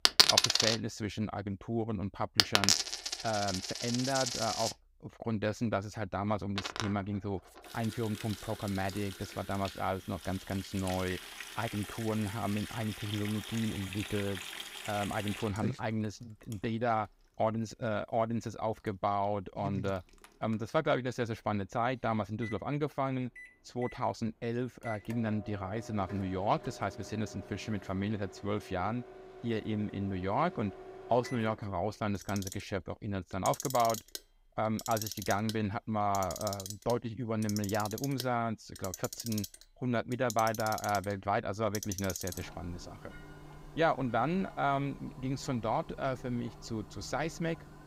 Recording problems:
household noises; loud; throughout; 1 dB below the speech

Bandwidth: 15.5 kHz